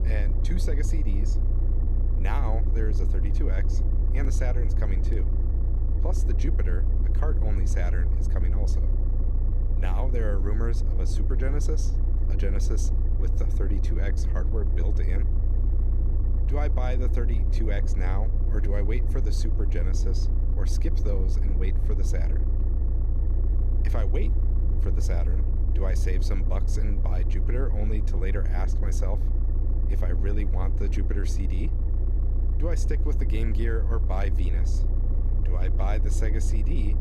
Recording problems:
low rumble; loud; throughout; 5 dB below the speech

